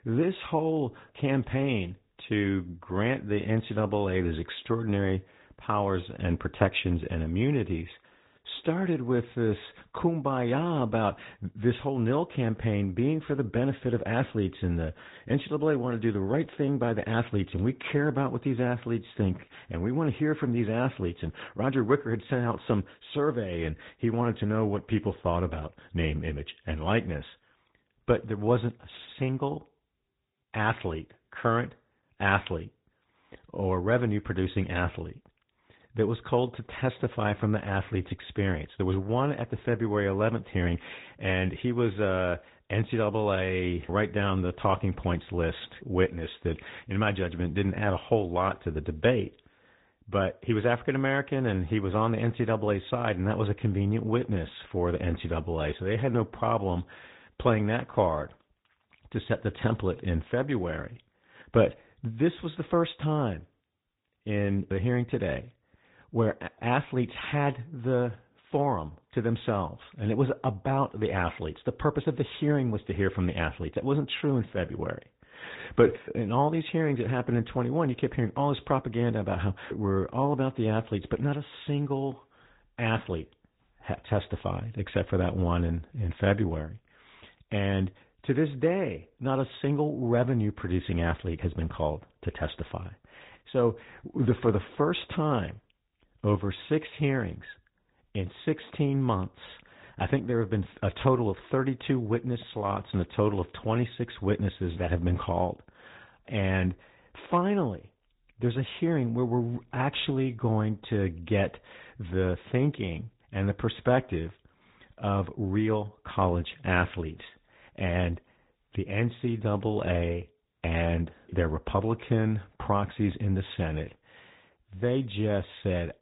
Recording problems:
high frequencies cut off; severe; nothing above 4 kHz
garbled, watery; slightly

